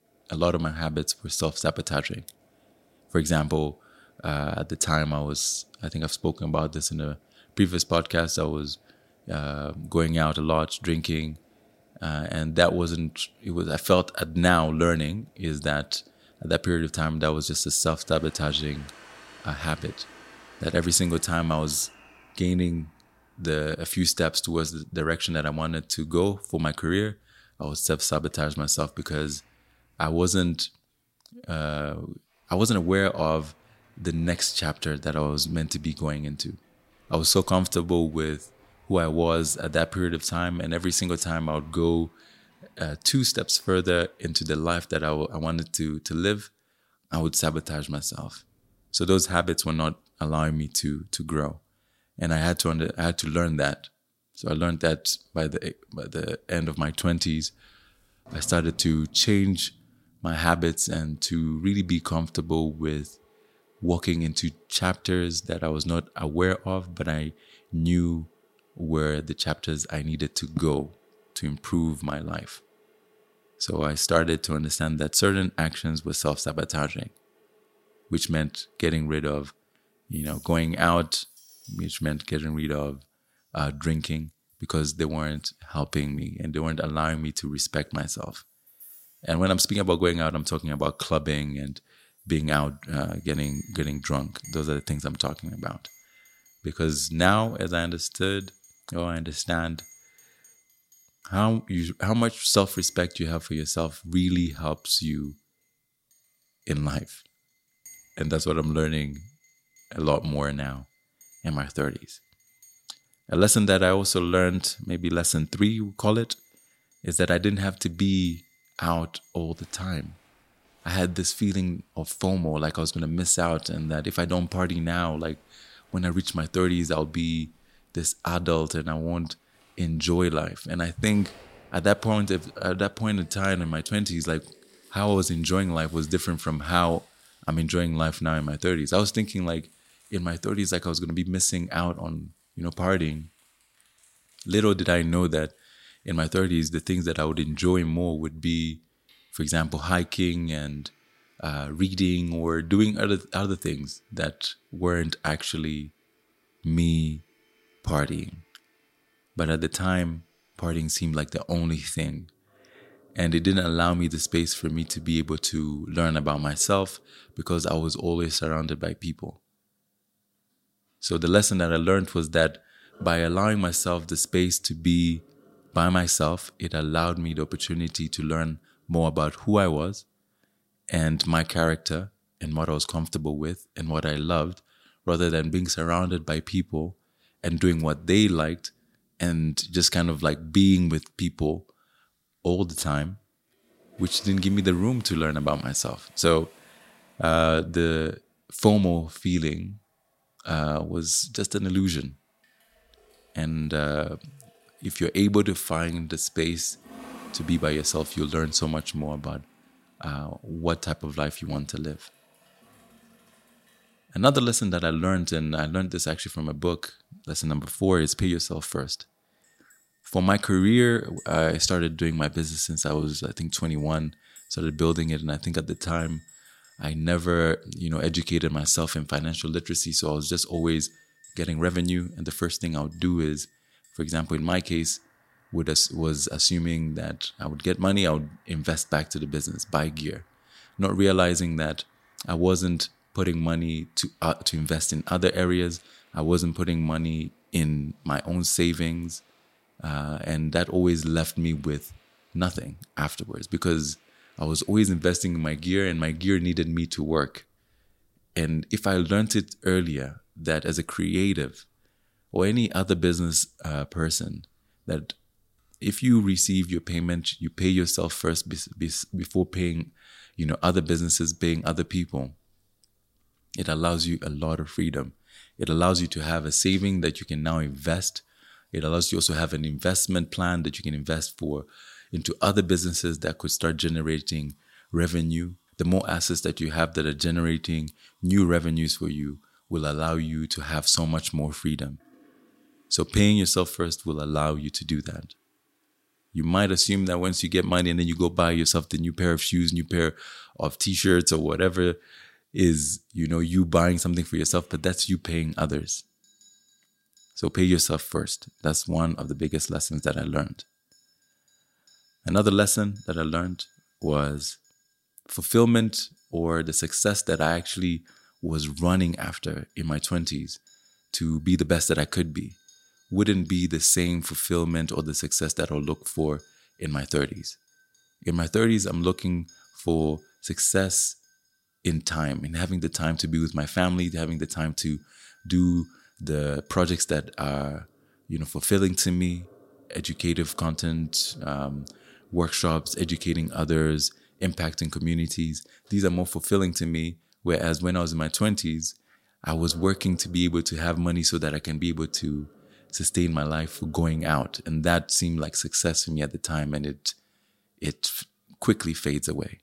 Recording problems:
household noises; faint; throughout; 30 dB below the speech

